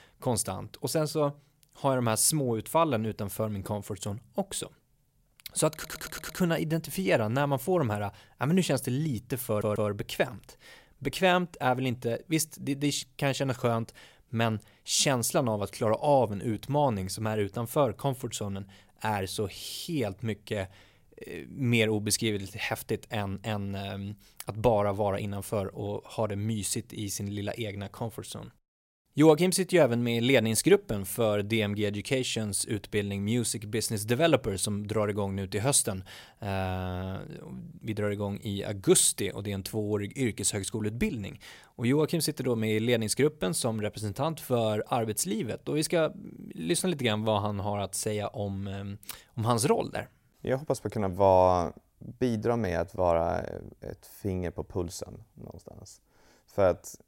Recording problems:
audio stuttering; at 5.5 s and at 9.5 s

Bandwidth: 16 kHz